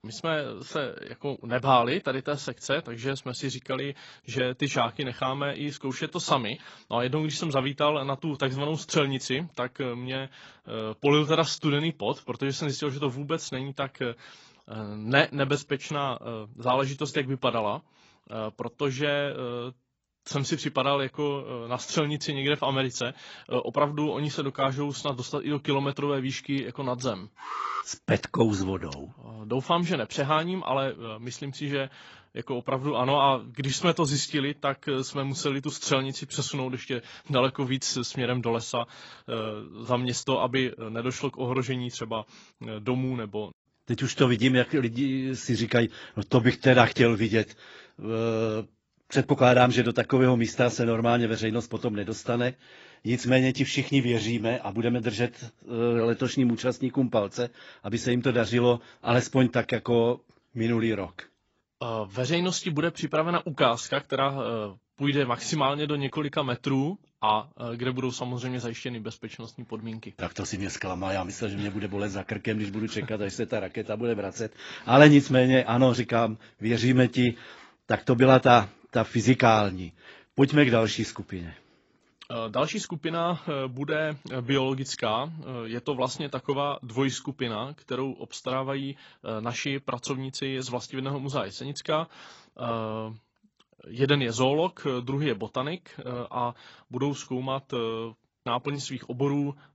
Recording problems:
garbled, watery; badly; nothing above 7.5 kHz
alarm; noticeable; at 27 s; peak 5 dB below the speech

